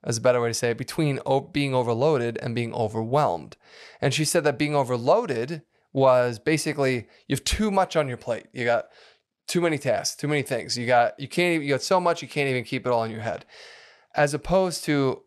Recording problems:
none

